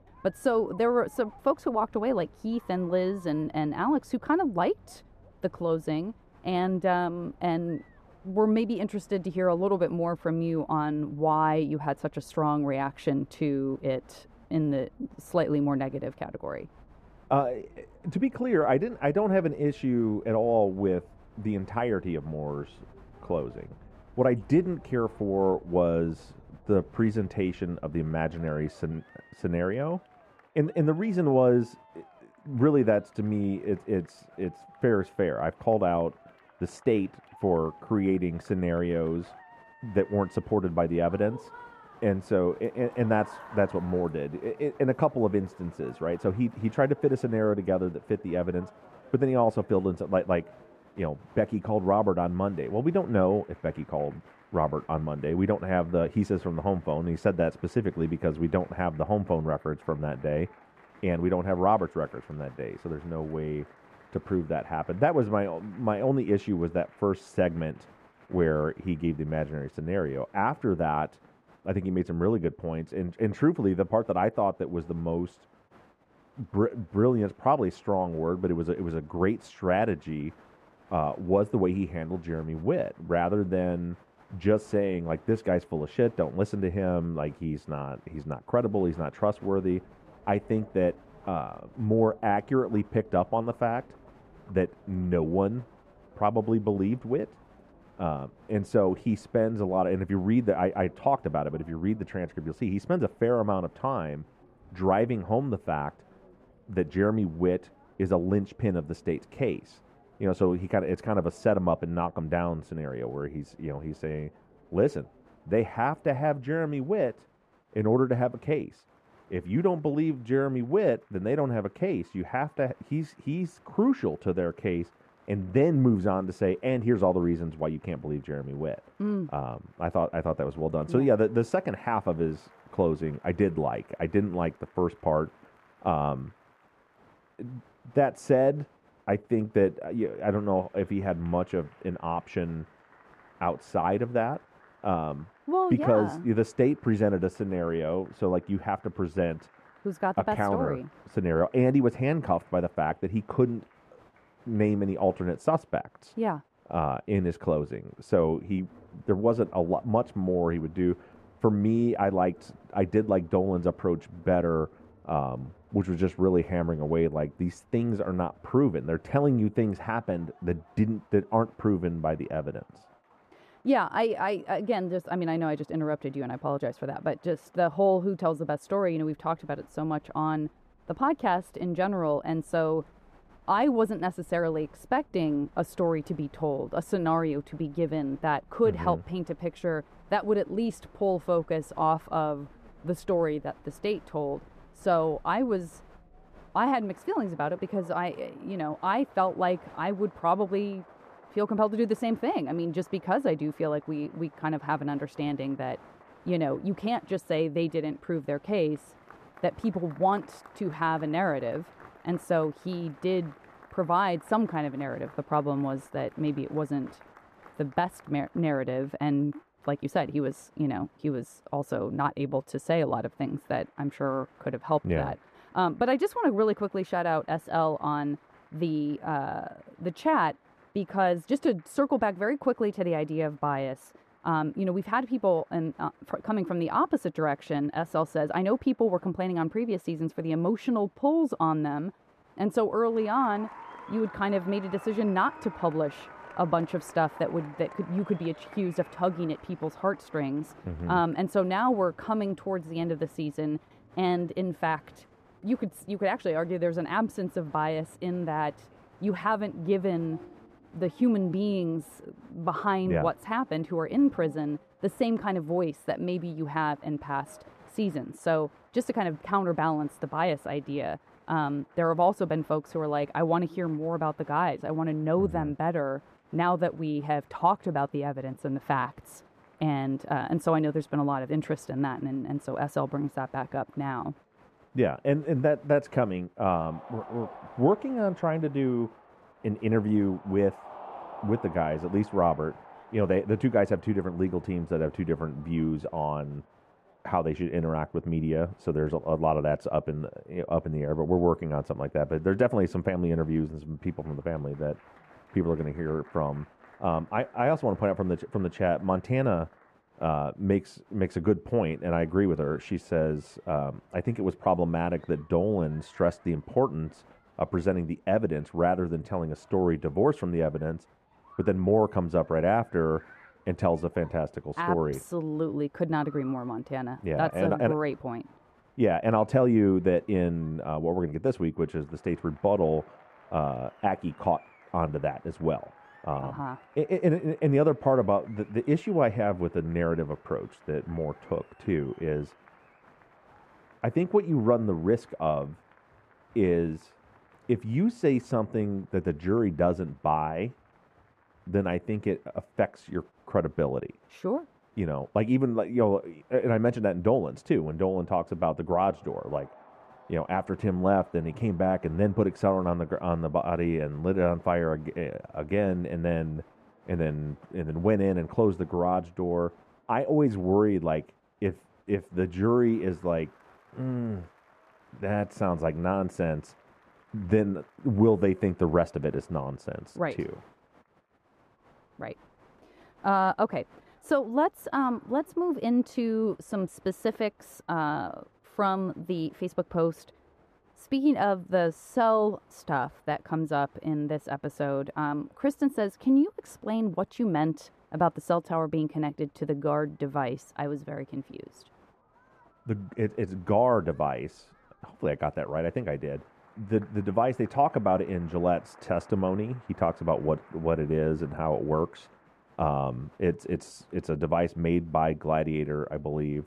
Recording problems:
muffled; very; fading above 2.5 kHz
crowd noise; faint; throughout; 25 dB below the speech

